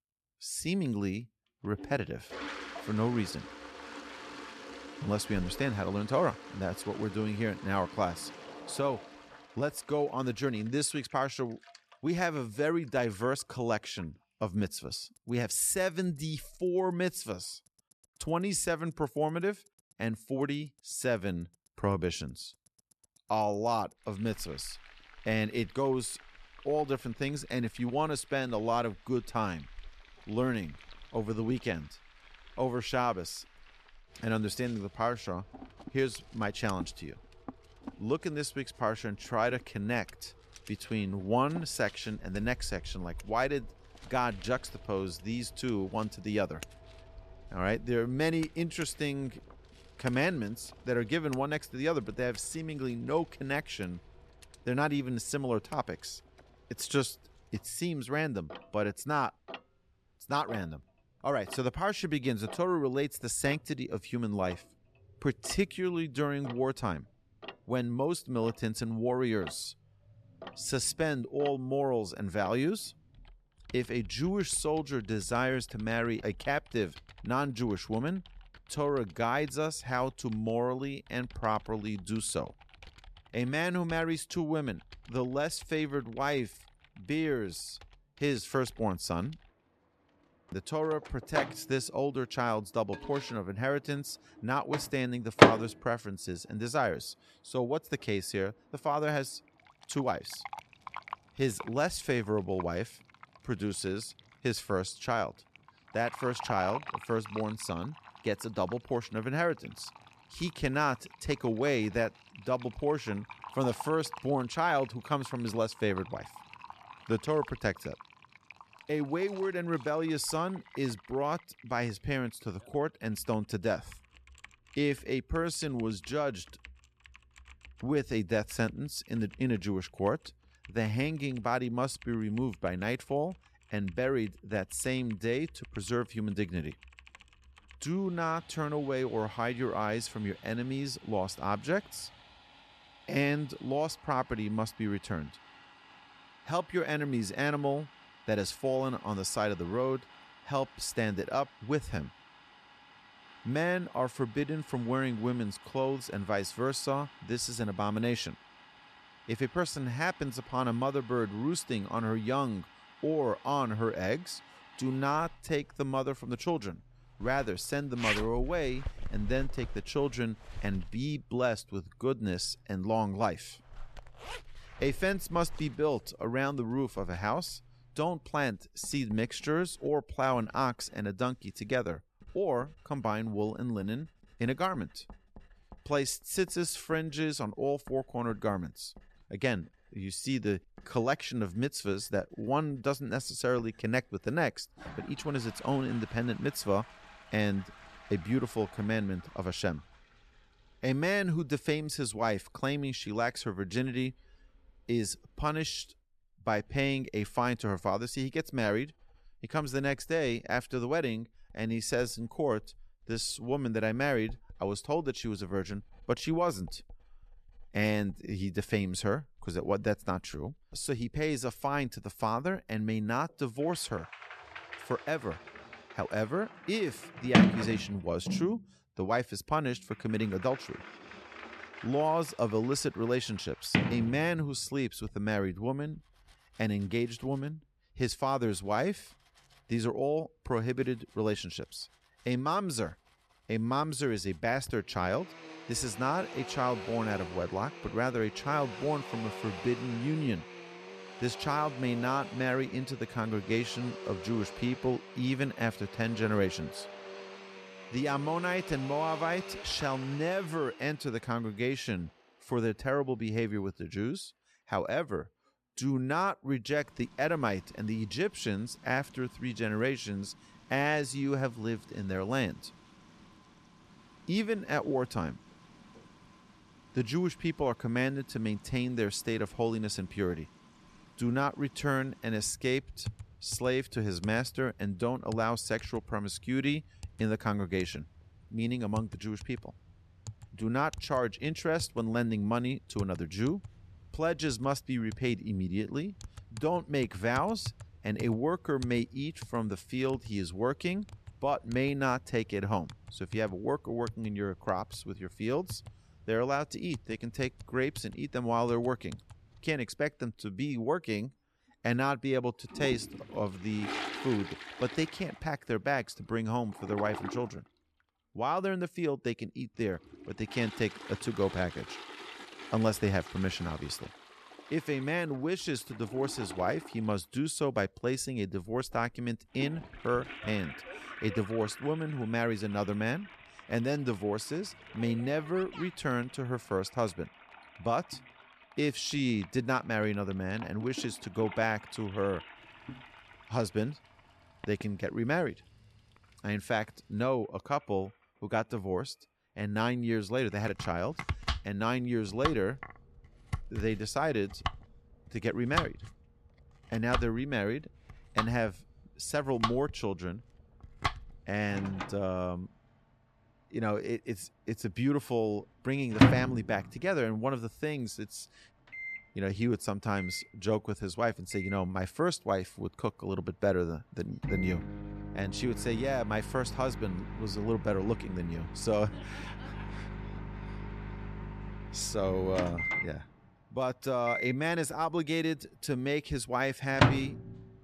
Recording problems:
household noises; loud; throughout; 7 dB below the speech

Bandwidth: 13.5 kHz